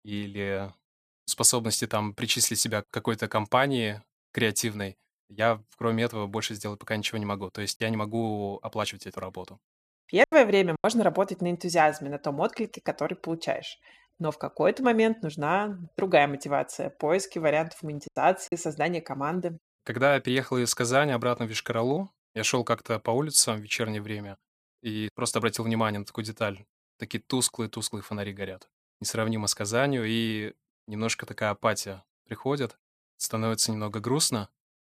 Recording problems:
choppy; very; from 8 to 11 s and at 18 s; 6% of the speech affected

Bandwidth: 15 kHz